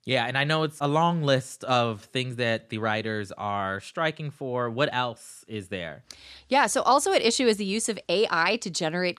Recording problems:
none

